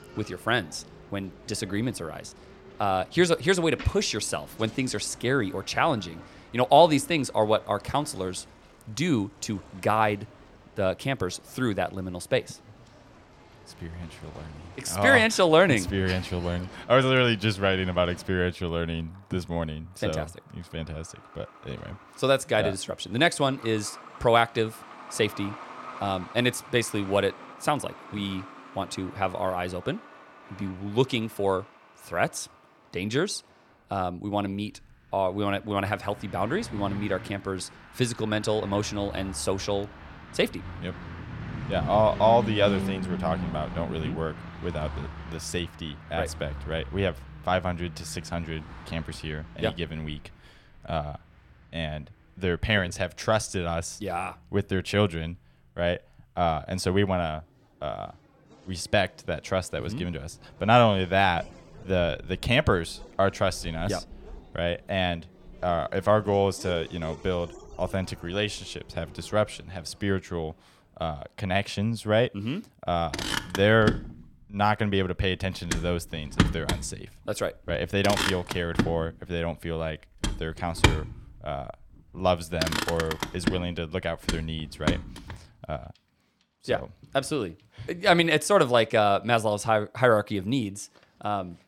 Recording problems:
traffic noise; loud; throughout; 9 dB below the speech

